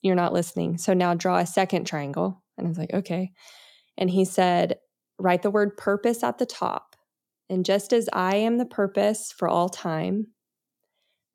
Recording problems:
none

